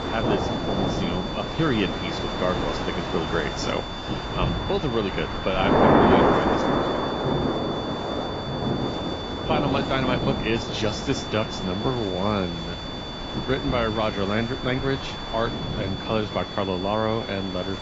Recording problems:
garbled, watery; badly
rain or running water; very loud; throughout; 1 dB above the speech
high-pitched whine; loud; throughout; 3.5 kHz, 9 dB below the speech
wind noise on the microphone; occasional gusts; 10 dB below the speech

